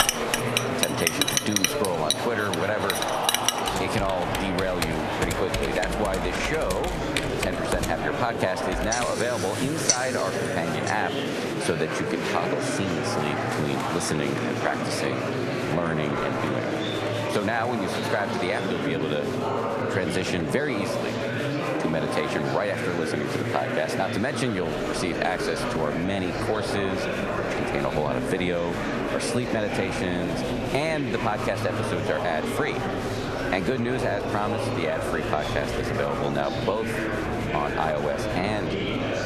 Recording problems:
echo of what is said; faint; from 28 s on; 260 ms later, 25 dB below the speech
squashed, flat; somewhat
household noises; very loud; until 10 s; as loud as the speech
murmuring crowd; loud; throughout; as loud as the speech

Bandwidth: 13.5 kHz